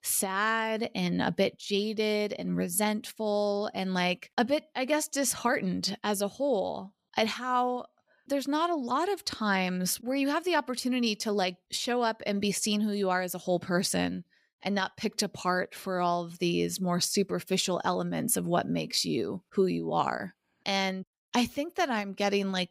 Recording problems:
none

